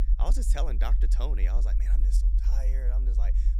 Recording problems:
low rumble; loud; throughout; 8 dB below the speech

